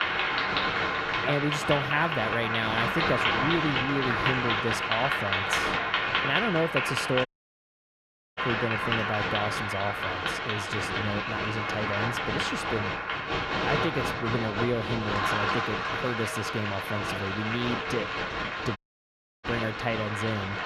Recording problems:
echo of what is said; noticeable; throughout; 240 ms later, 20 dB below the speech
crowd noise; very loud; throughout; 3 dB above the speech
household noises; very faint; throughout; 30 dB below the speech
audio cutting out; at 7.5 s for 1 s and at 19 s for 0.5 s

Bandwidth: 13.5 kHz